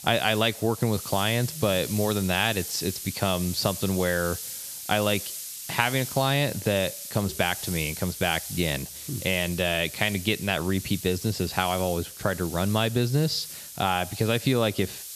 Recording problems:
hiss; loud; throughout; 9 dB below the speech

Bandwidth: 14 kHz